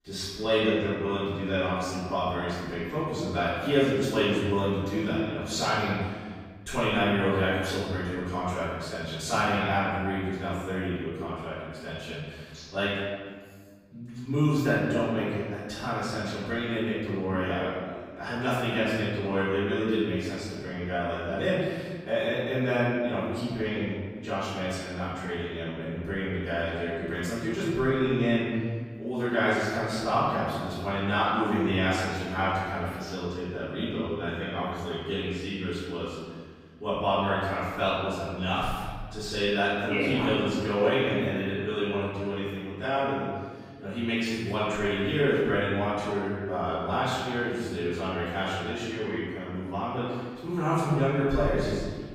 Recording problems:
room echo; strong; dies away in 1.6 s
off-mic speech; far

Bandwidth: 15.5 kHz